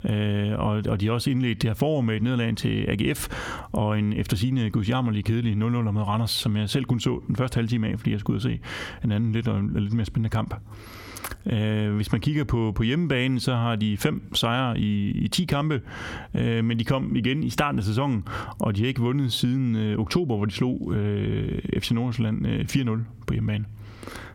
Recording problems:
squashed, flat; somewhat

